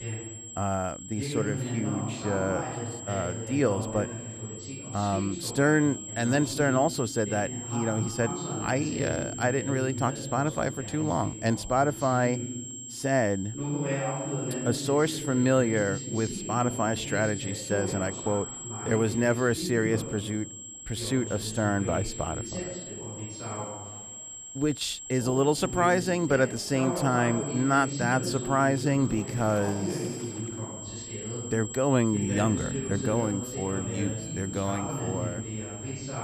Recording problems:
voice in the background; loud; throughout; 8 dB below the speech
high-pitched whine; noticeable; throughout; 7.5 kHz, 10 dB below the speech
rain or running water; faint; throughout; 25 dB below the speech

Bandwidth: 14.5 kHz